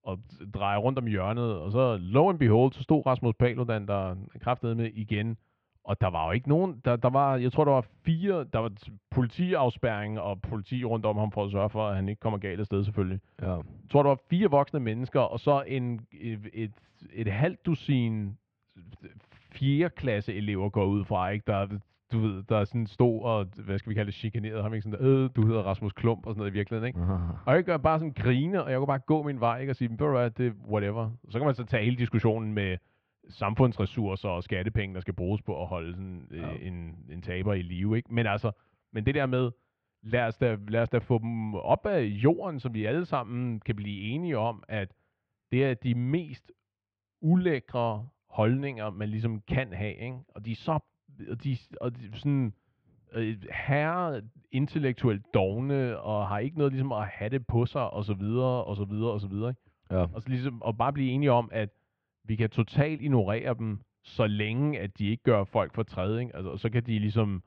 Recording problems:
muffled; very; fading above 2.5 kHz

